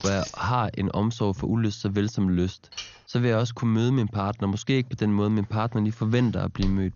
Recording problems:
garbled, watery; slightly; nothing above 6.5 kHz
jangling keys; noticeable; at the start; peak 9 dB below the speech
clattering dishes; faint; at 2.5 s; peak 10 dB below the speech
footsteps; very faint; at 6.5 s; peak 10 dB below the speech

